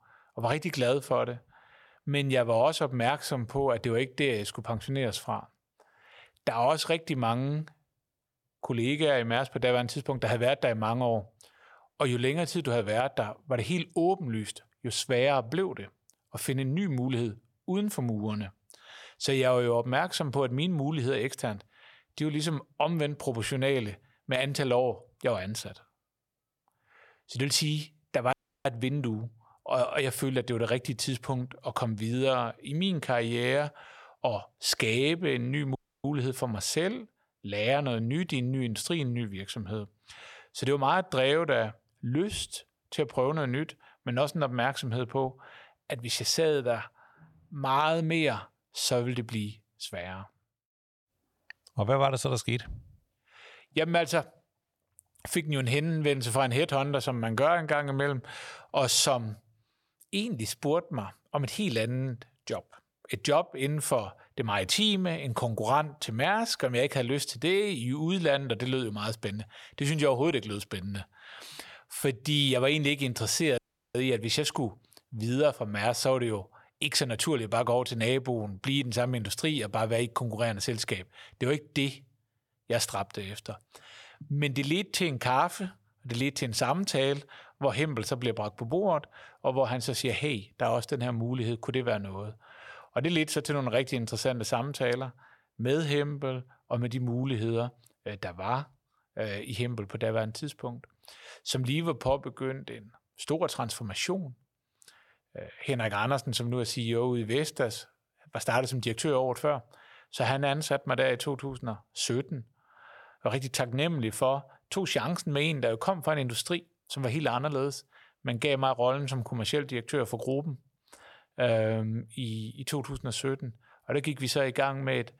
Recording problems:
audio cutting out; at 28 s, at 36 s and at 1:14

